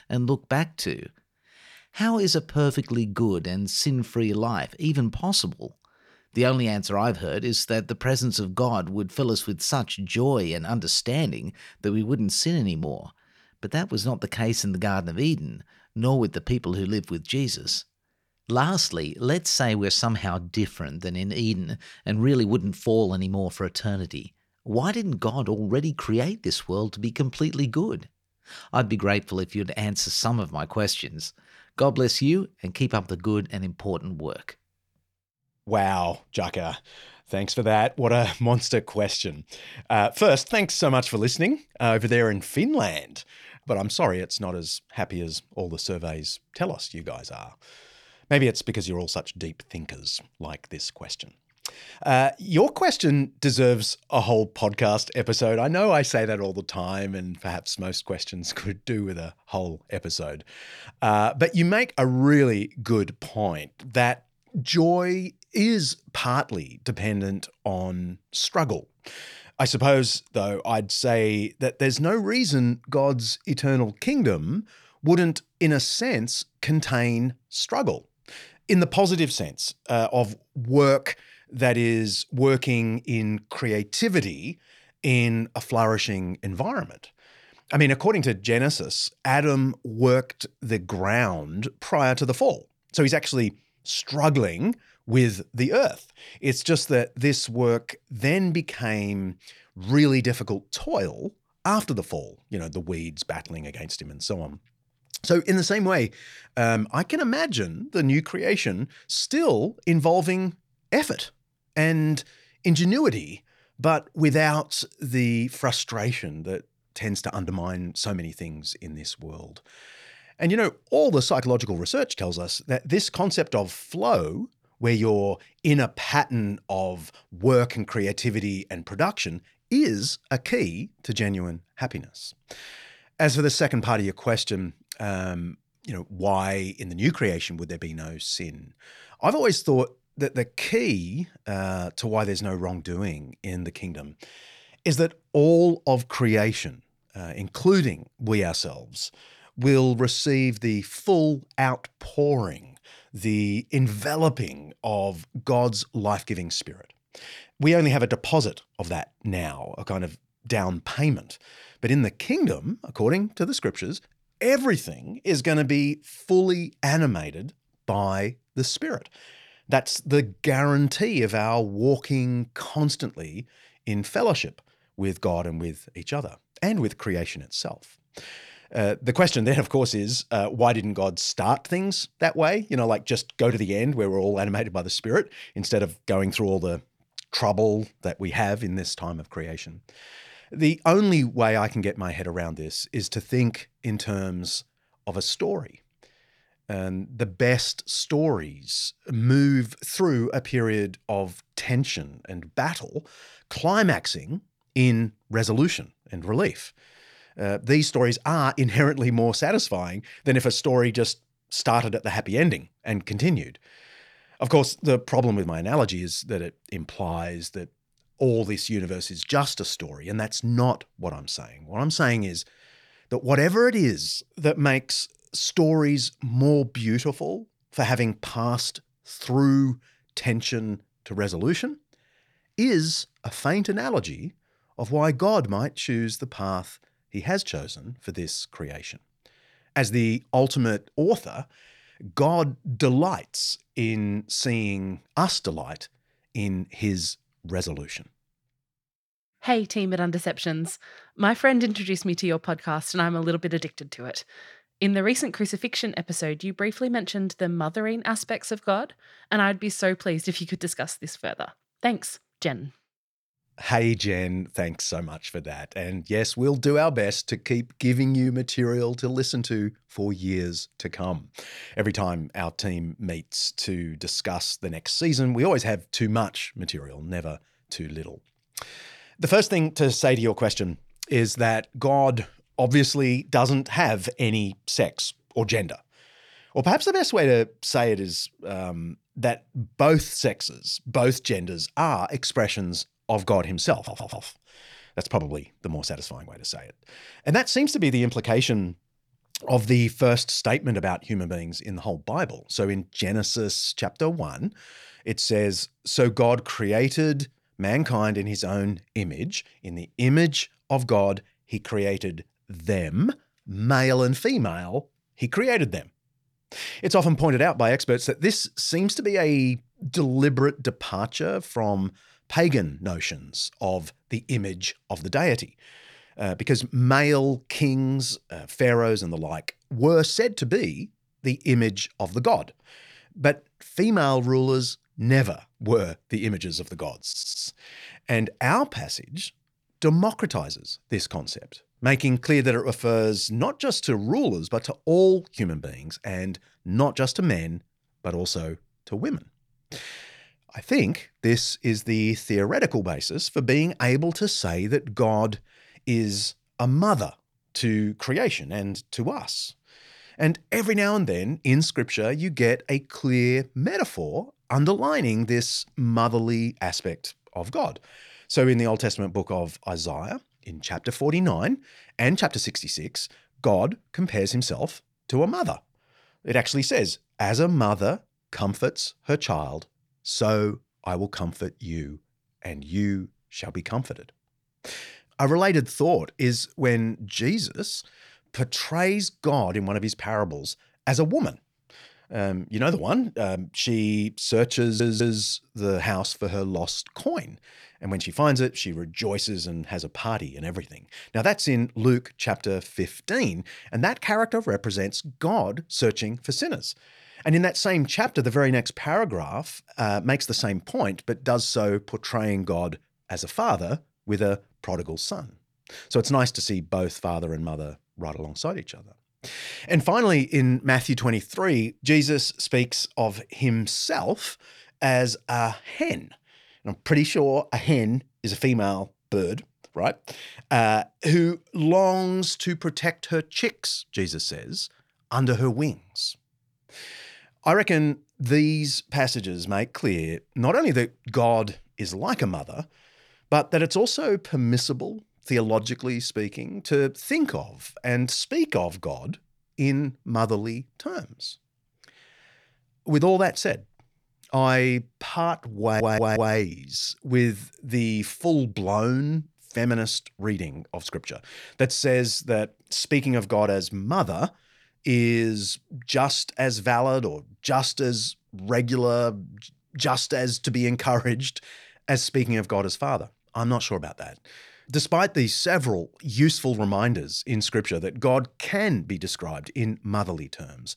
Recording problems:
audio stuttering; 4 times, first at 4:54

